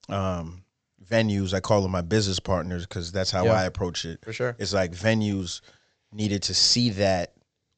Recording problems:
high frequencies cut off; noticeable; nothing above 8 kHz

